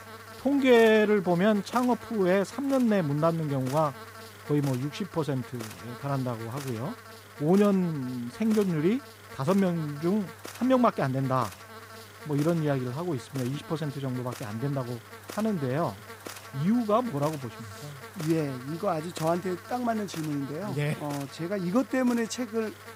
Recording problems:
electrical hum; noticeable; throughout; 50 Hz, 15 dB below the speech

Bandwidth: 15.5 kHz